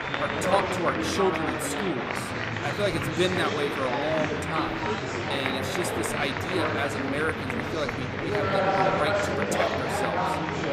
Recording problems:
murmuring crowd; very loud; throughout; 3 dB above the speech

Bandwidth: 15.5 kHz